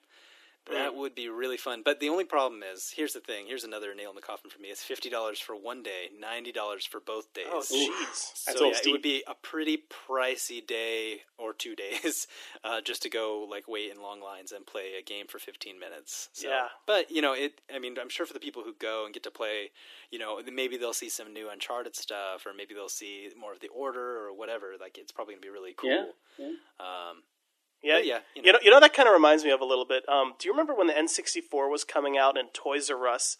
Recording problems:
thin; somewhat; fading below 300 Hz

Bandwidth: 14.5 kHz